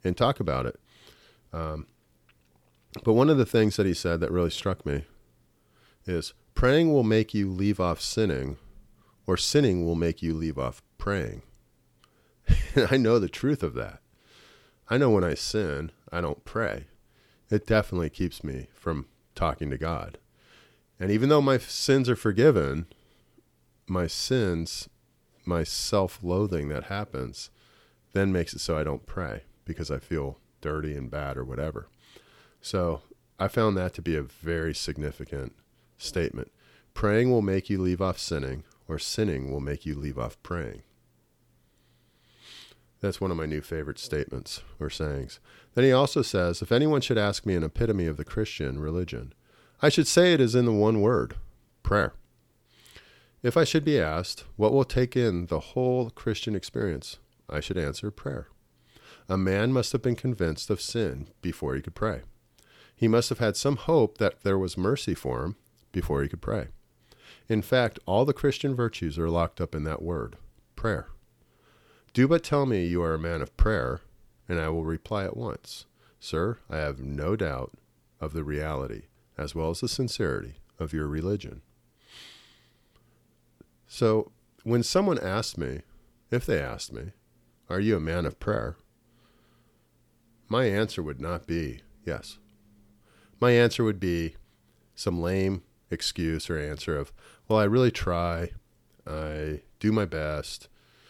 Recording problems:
none

